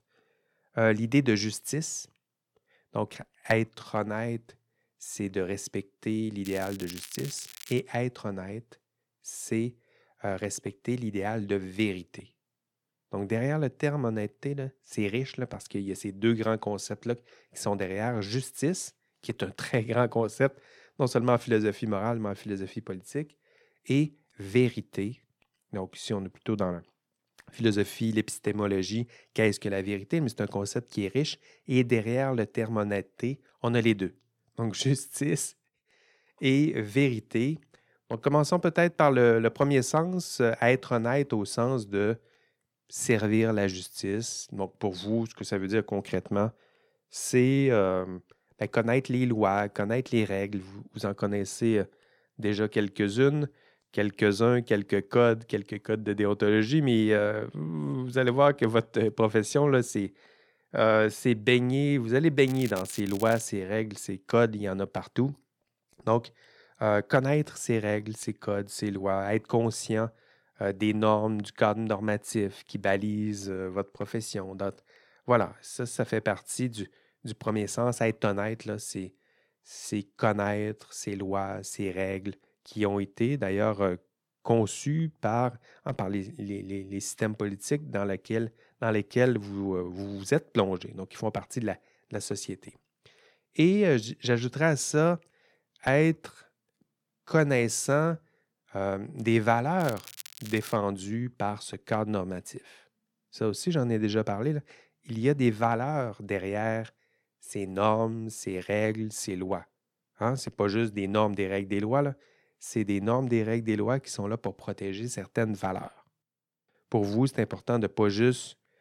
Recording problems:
crackling; noticeable; from 6.5 to 8 s, at 1:02 and at 1:40; 15 dB below the speech

